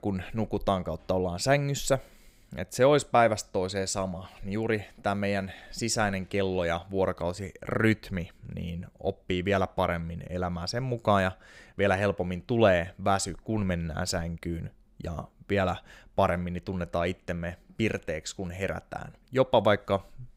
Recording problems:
none

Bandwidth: 15.5 kHz